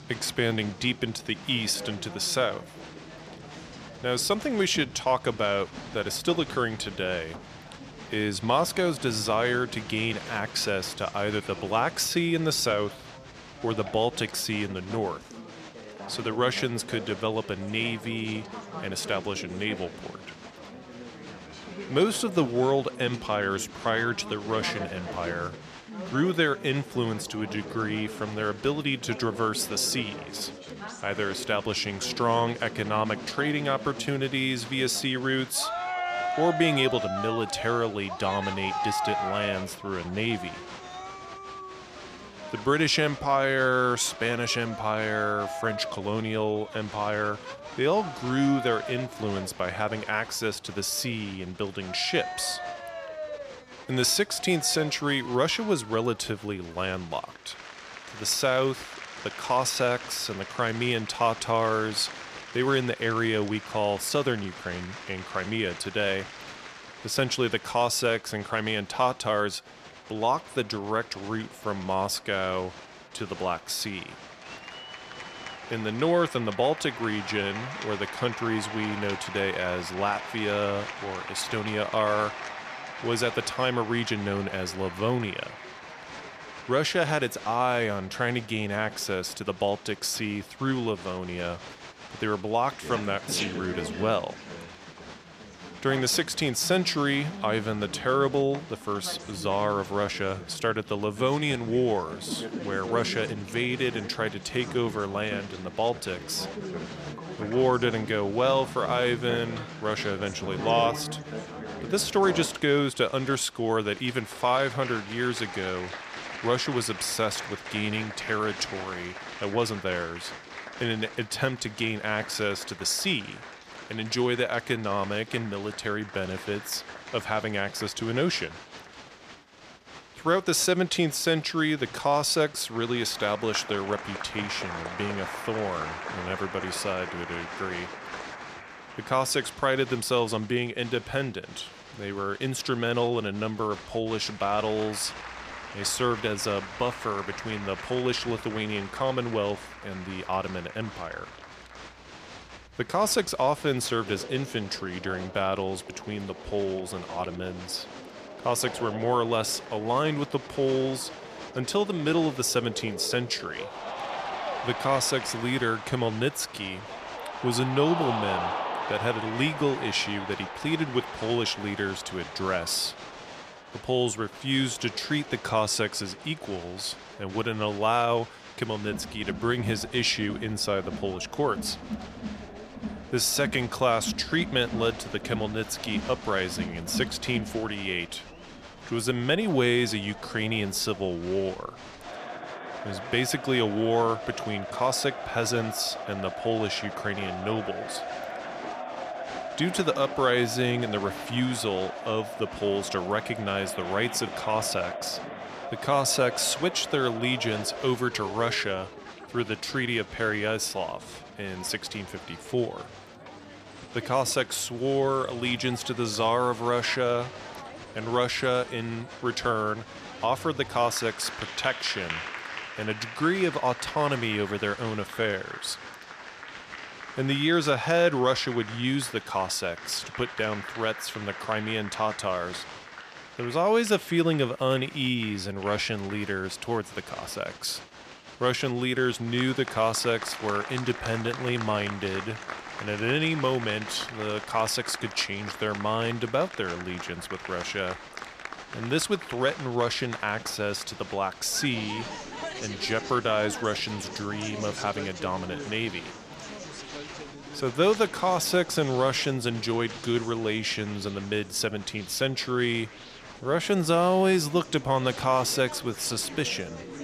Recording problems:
crowd noise; noticeable; throughout; 10 dB below the speech

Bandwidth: 14.5 kHz